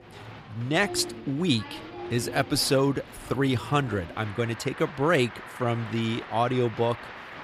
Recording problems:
crowd noise; noticeable; throughout; 15 dB below the speech

